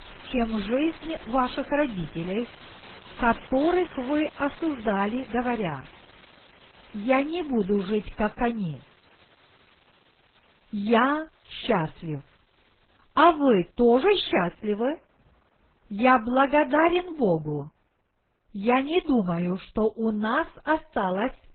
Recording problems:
garbled, watery; badly; nothing above 4 kHz
rain or running water; faint; throughout; 20 dB below the speech

